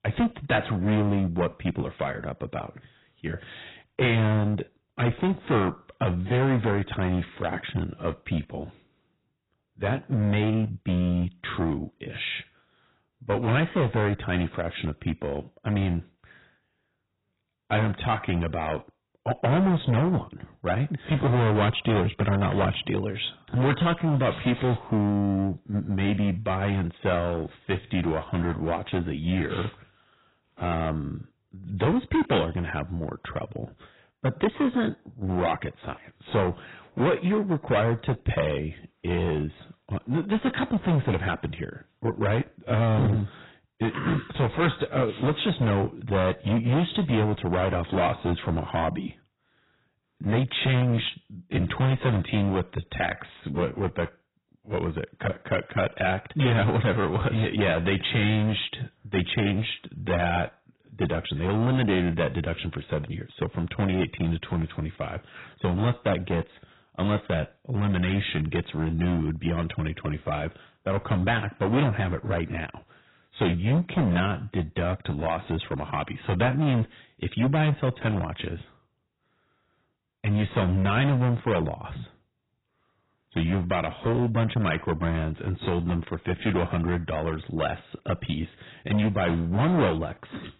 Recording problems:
distortion; heavy; 10% of the sound clipped
garbled, watery; badly; nothing above 4 kHz

